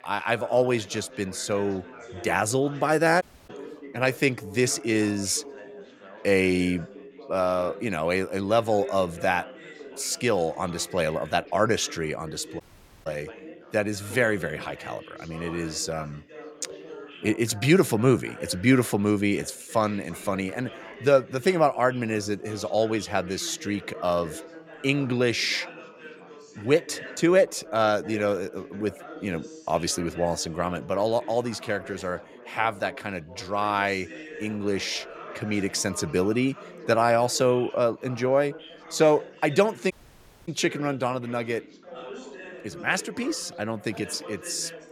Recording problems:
chatter from many people; noticeable; throughout; 15 dB below the speech
audio cutting out; at 3 s, at 13 s and at 40 s for 0.5 s

